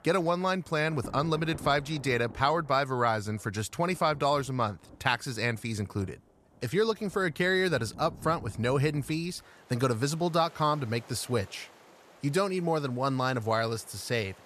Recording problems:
rain or running water; faint; throughout; 20 dB below the speech

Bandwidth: 14 kHz